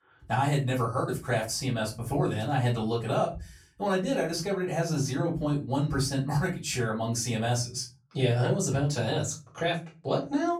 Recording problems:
off-mic speech; far
room echo; very slight; dies away in 0.3 s

